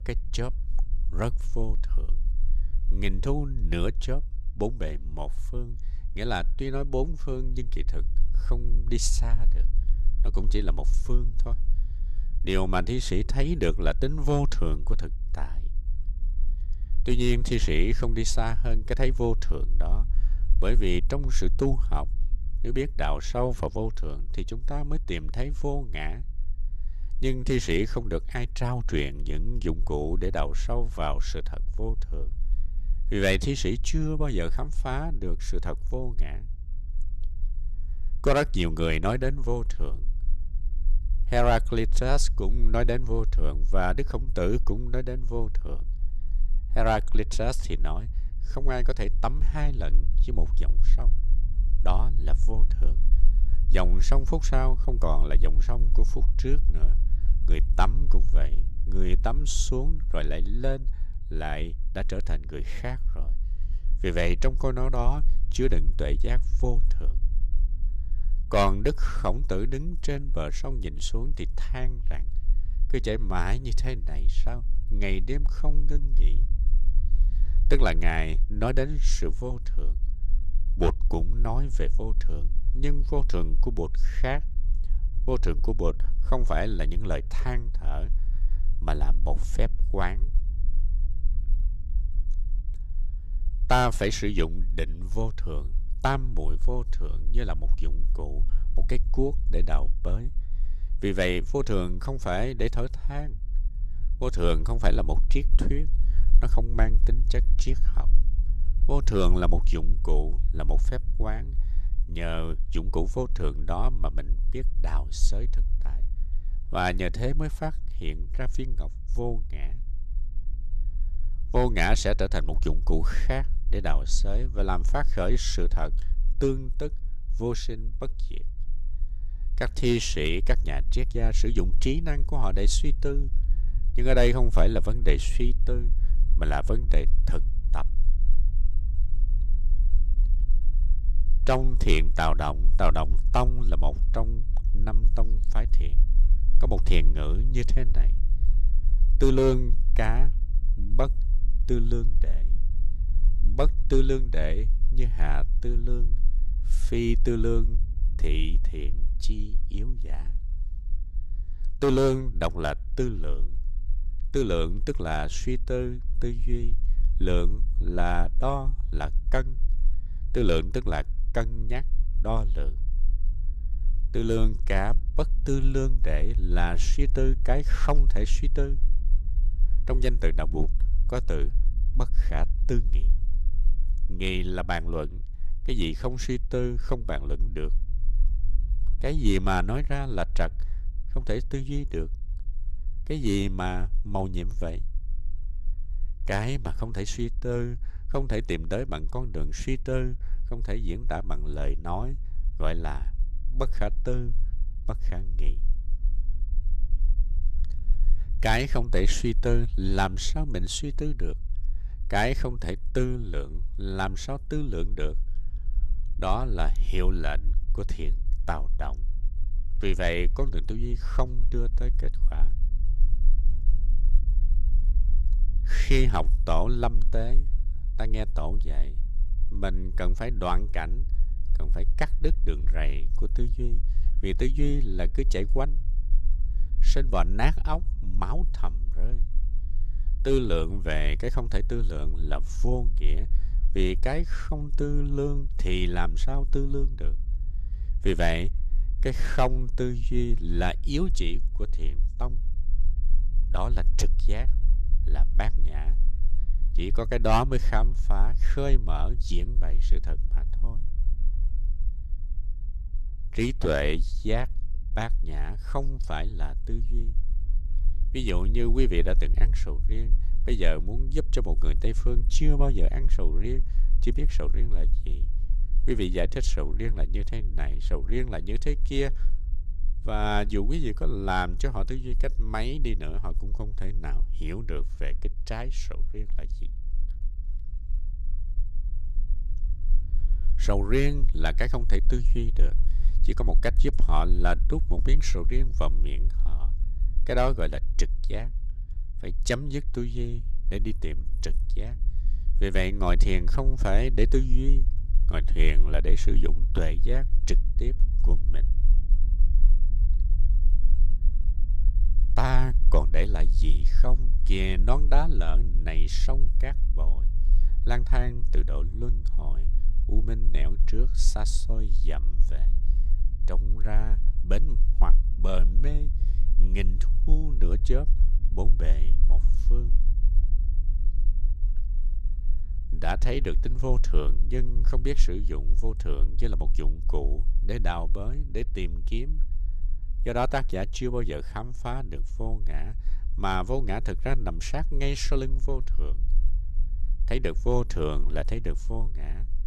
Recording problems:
low rumble; faint; throughout; 20 dB below the speech

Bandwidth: 14.5 kHz